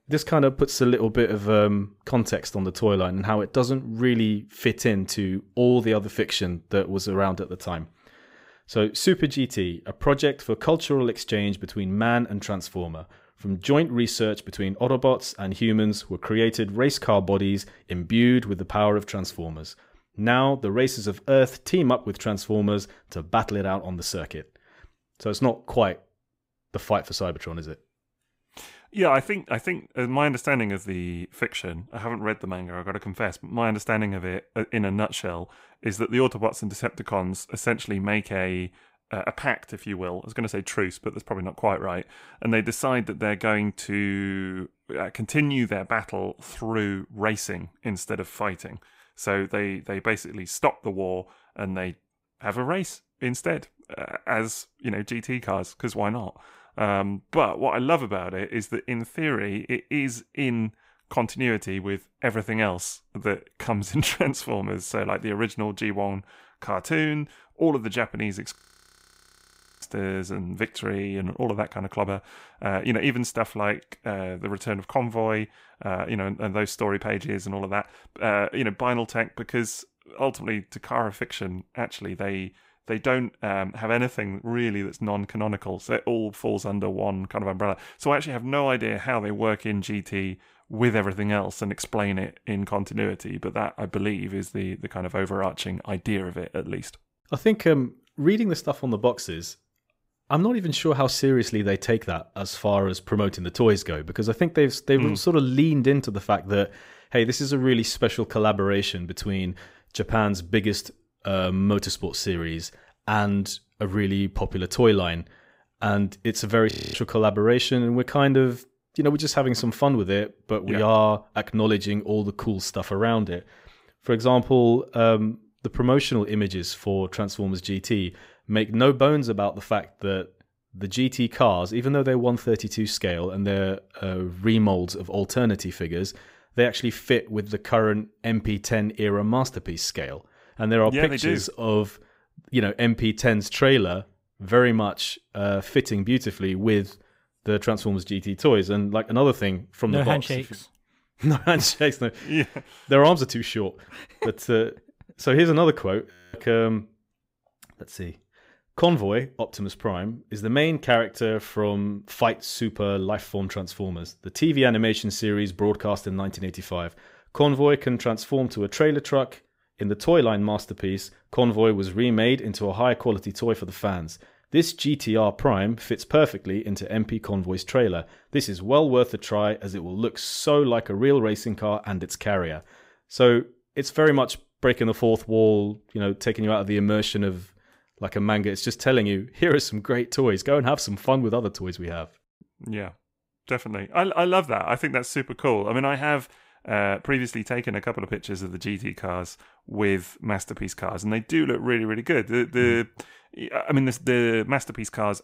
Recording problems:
audio freezing; at 1:09 for 1.5 s, at 1:57 and at 2:36

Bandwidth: 15.5 kHz